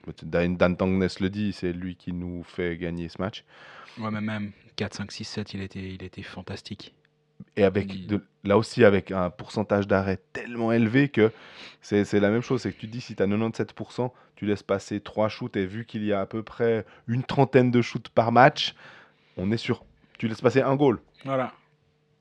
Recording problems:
muffled; very slightly; fading above 3 kHz

